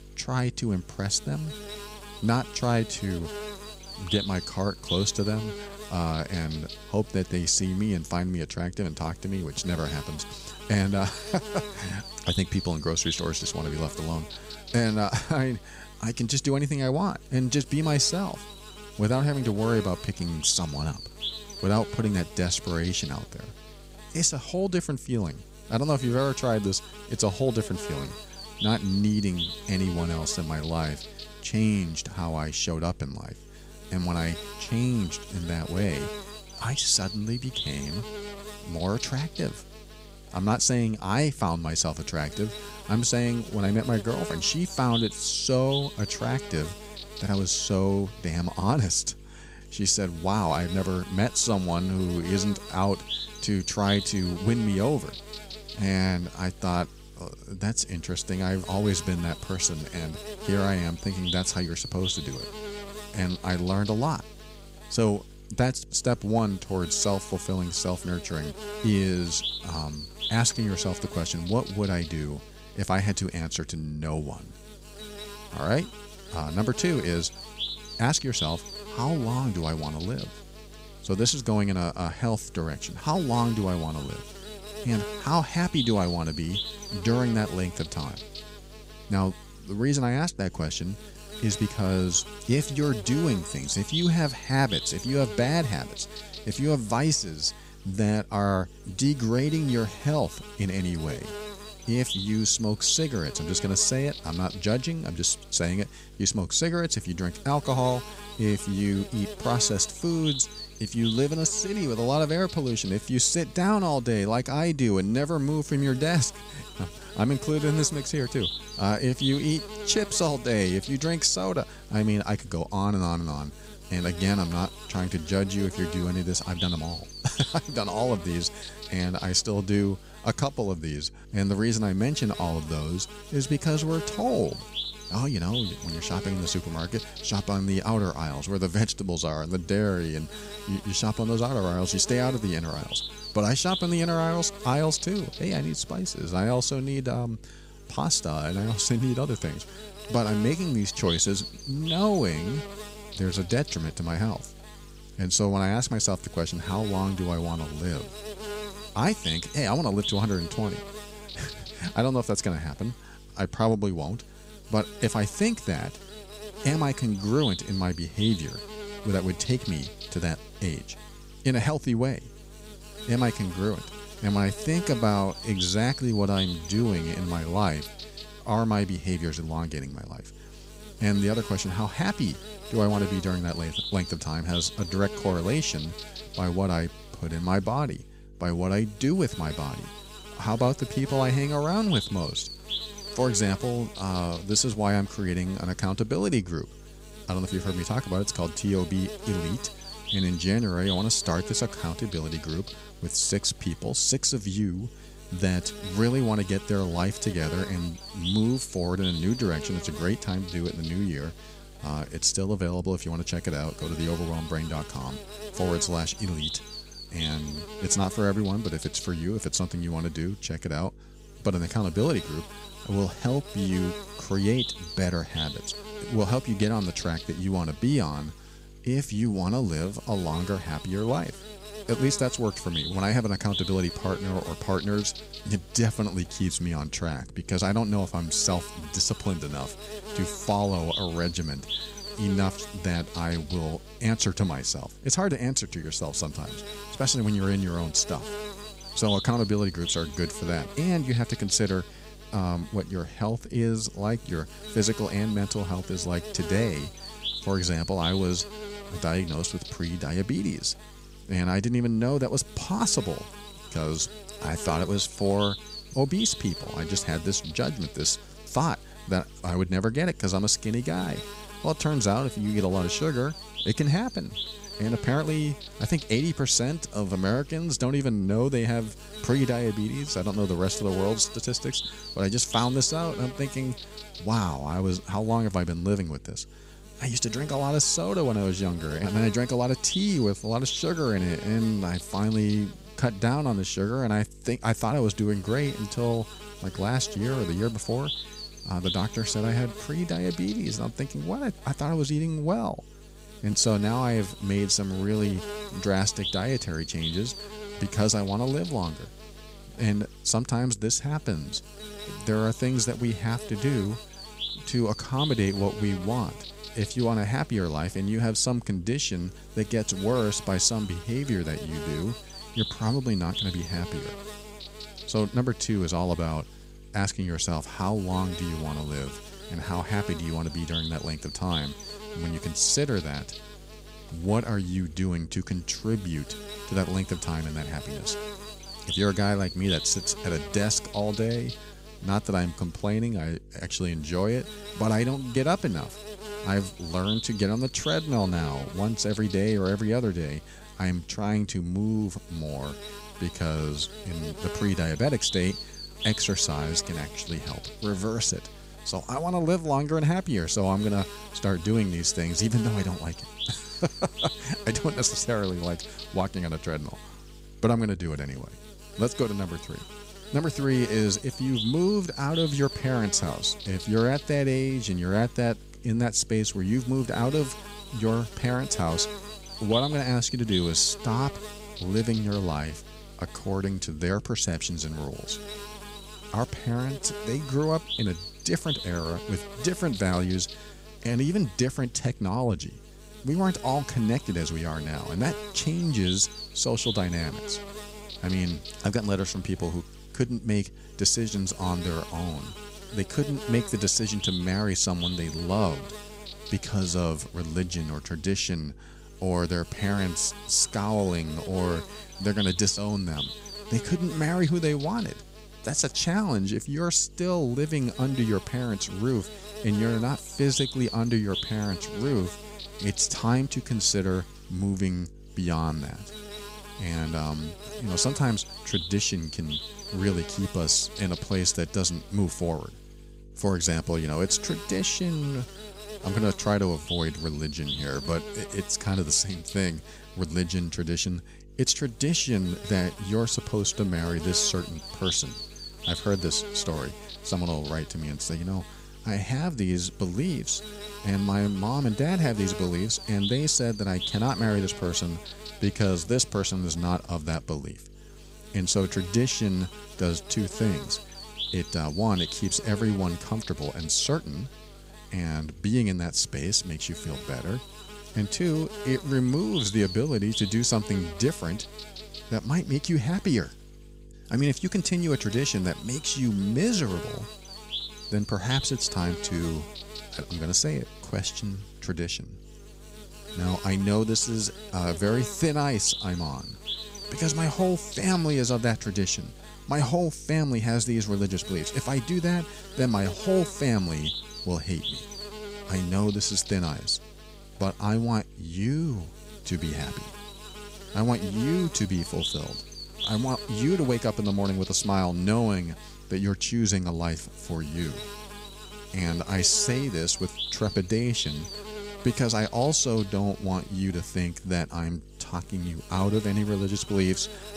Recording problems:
electrical hum; loud; throughout; 50 Hz, 8 dB below the speech

